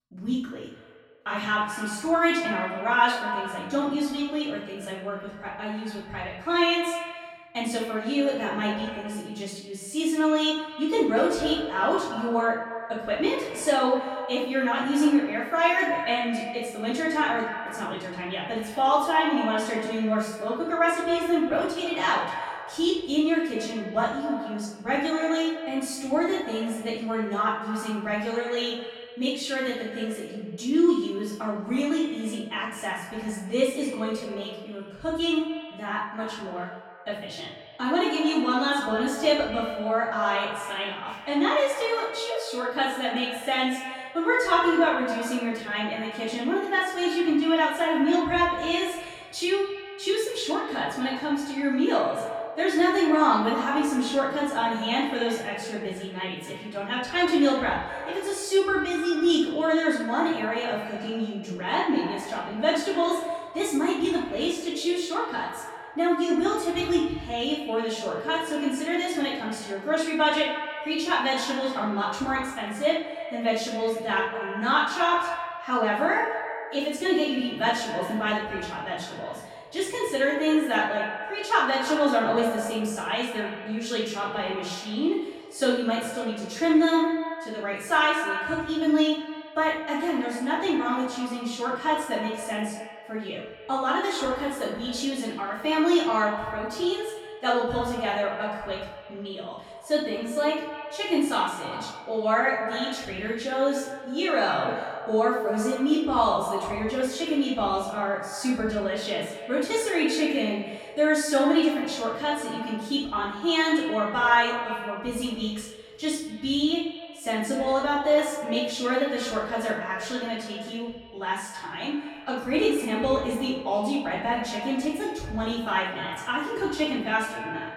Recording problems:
echo of what is said; strong; throughout; 110 ms later, 10 dB below the speech
off-mic speech; far
room echo; noticeable; dies away in 0.5 s

